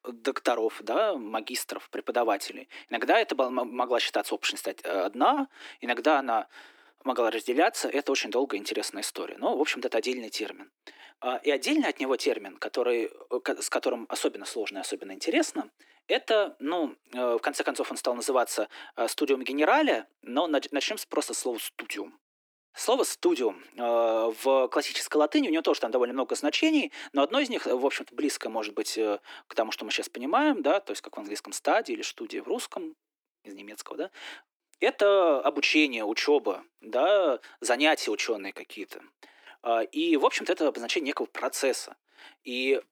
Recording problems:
thin; somewhat; fading below 300 Hz

